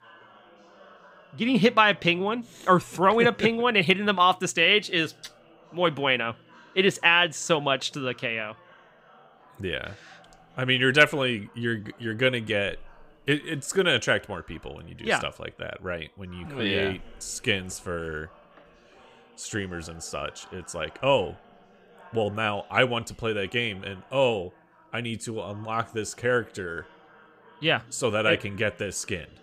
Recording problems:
background chatter; faint; throughout; 4 voices, 30 dB below the speech

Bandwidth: 15.5 kHz